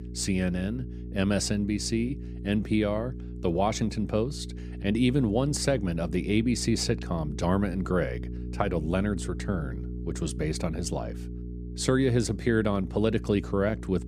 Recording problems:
electrical hum; noticeable; throughout; 60 Hz, 15 dB below the speech

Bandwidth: 15 kHz